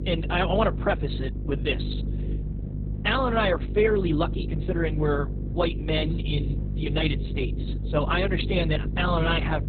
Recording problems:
garbled, watery; badly; nothing above 4 kHz
electrical hum; noticeable; throughout; 50 Hz, 15 dB below the speech

